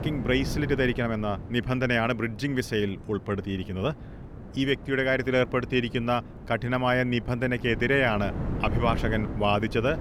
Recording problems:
wind noise on the microphone; occasional gusts; 15 dB below the speech

